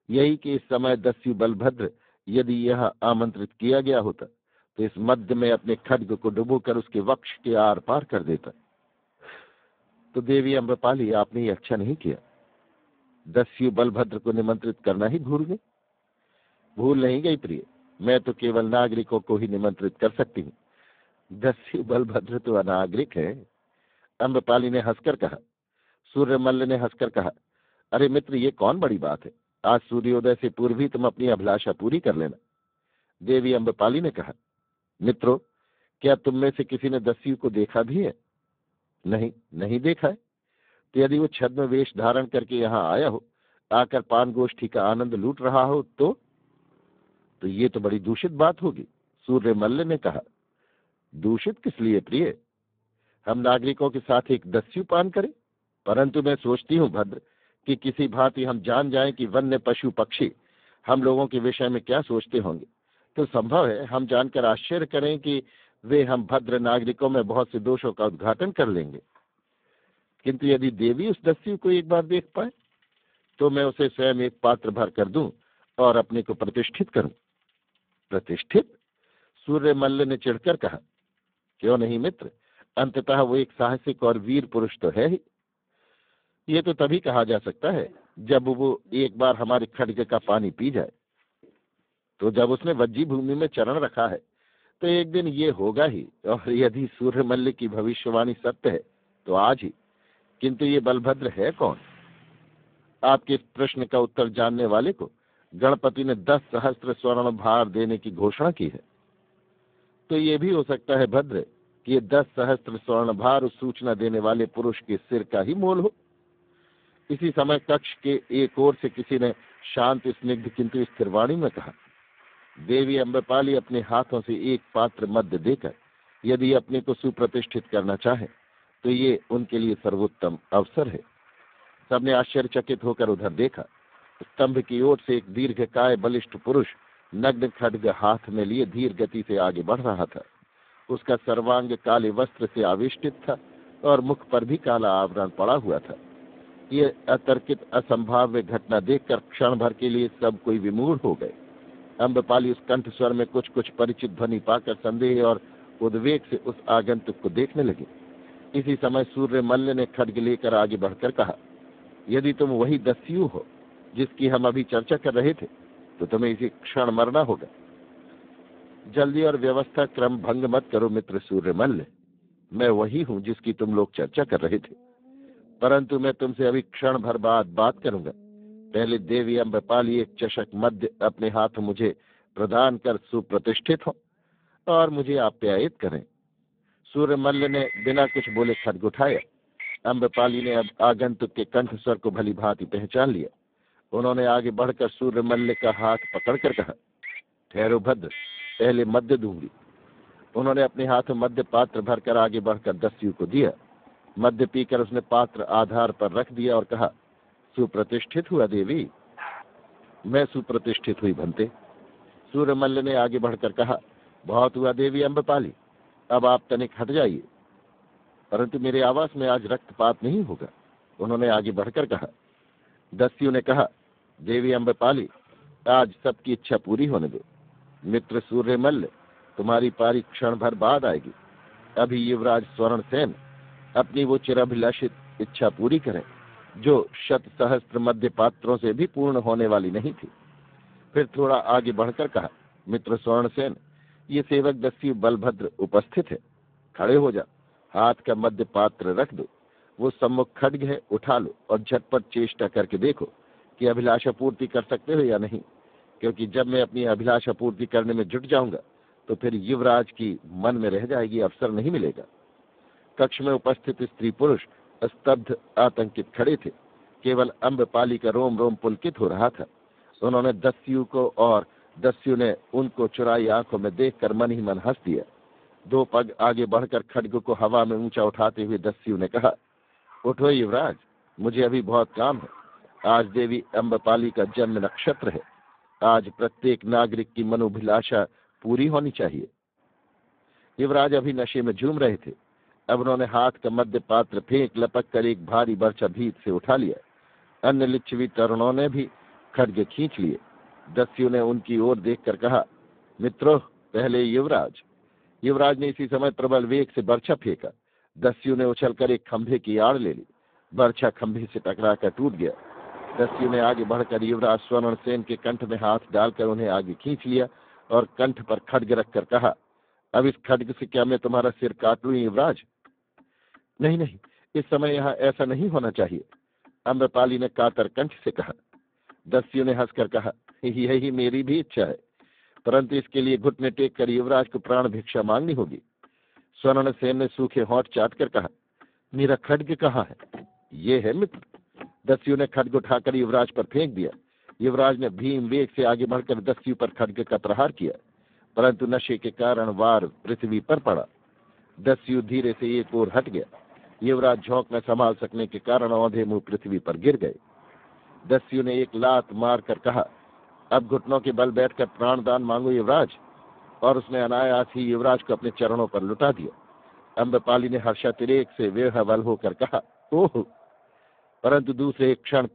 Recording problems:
phone-call audio; poor line; nothing above 3.5 kHz
traffic noise; faint; throughout; 20 dB below the speech
dog barking; faint; at 3:29; peak 15 dB below the speech

